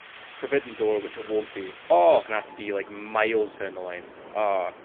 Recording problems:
phone-call audio; poor line; nothing above 3.5 kHz
wind in the background; noticeable; throughout; 20 dB below the speech

